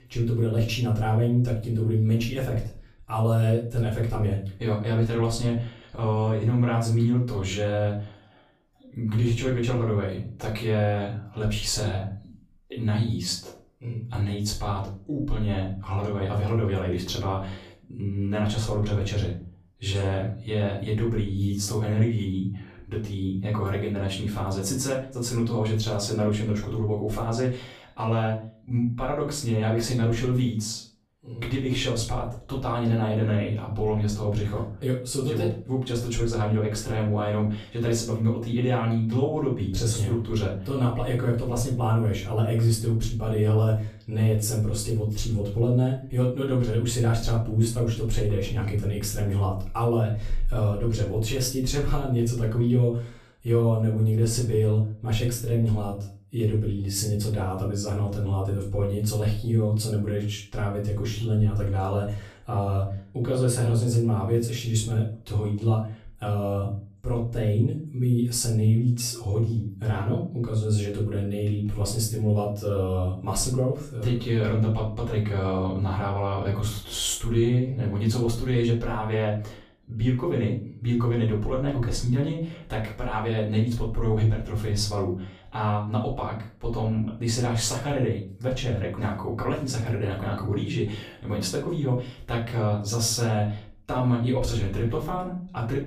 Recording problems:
off-mic speech; far
room echo; slight; dies away in 0.4 s

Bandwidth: 14.5 kHz